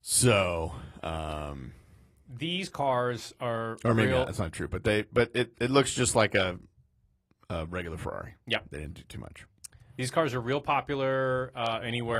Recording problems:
garbled, watery; slightly
abrupt cut into speech; at the end

